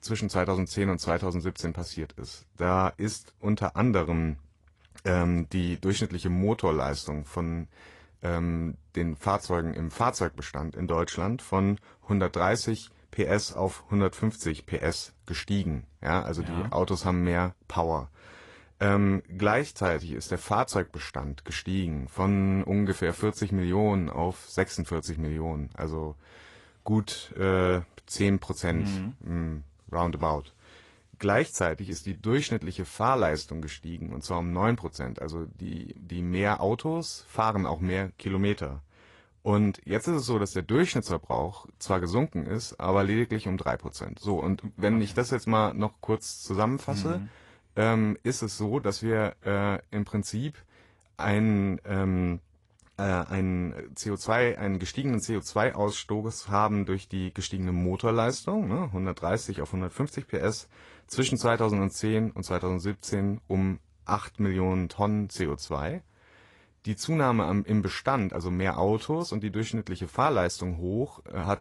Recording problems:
garbled, watery; slightly; nothing above 11 kHz

